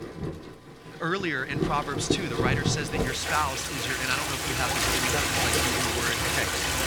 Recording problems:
rain or running water; very loud; throughout; 4 dB above the speech

